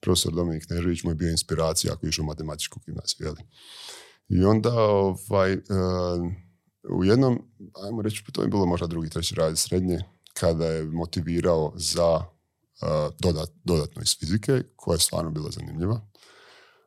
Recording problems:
none

